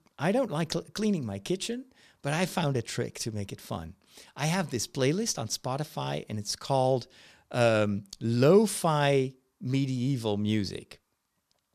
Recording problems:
none

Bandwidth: 14 kHz